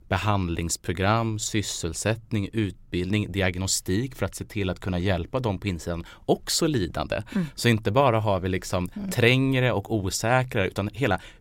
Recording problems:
none

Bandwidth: 16 kHz